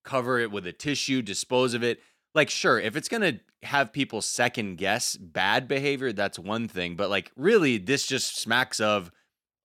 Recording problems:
none

